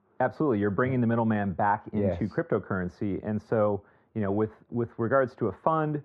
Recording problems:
muffled; very; fading above 3.5 kHz

